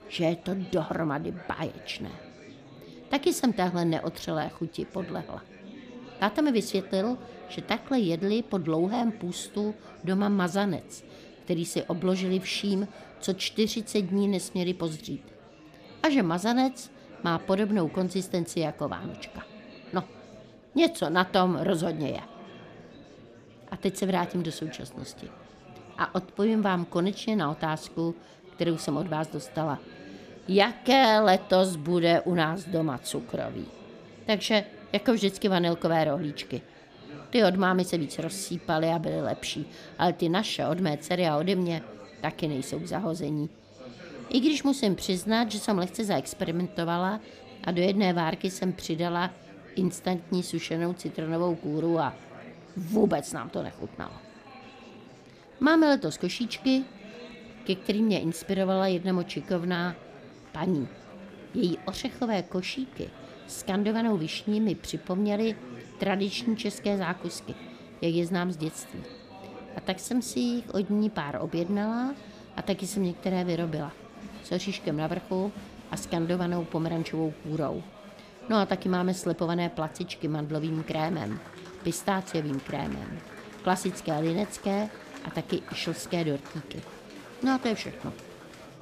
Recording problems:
murmuring crowd; noticeable; throughout; 20 dB below the speech

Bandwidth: 14.5 kHz